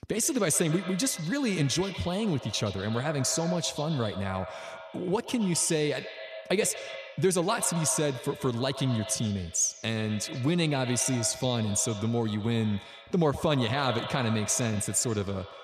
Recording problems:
echo of what is said; noticeable; throughout; 120 ms later, 10 dB below the speech

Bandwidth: 14.5 kHz